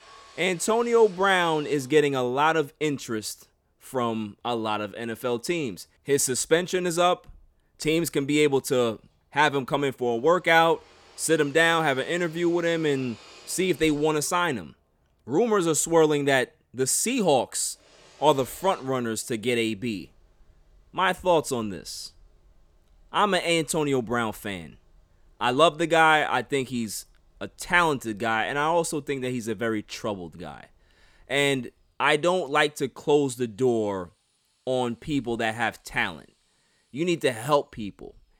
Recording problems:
machinery noise; faint; throughout; 30 dB below the speech

